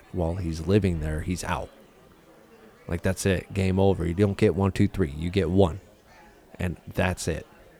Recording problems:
murmuring crowd; faint; throughout; 30 dB below the speech

